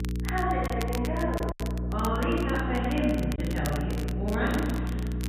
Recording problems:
room echo; strong; dies away in 1.8 s
off-mic speech; far
high frequencies cut off; severe; nothing above 4 kHz
electrical hum; noticeable; throughout; 60 Hz, 10 dB below the speech
crackle, like an old record; noticeable; 15 dB below the speech
choppy; occasionally; at 0.5 s and at 3.5 s; 3% of the speech affected

